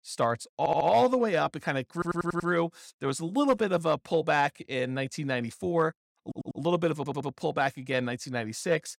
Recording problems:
audio stuttering; 4 times, first at 0.5 s

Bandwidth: 16.5 kHz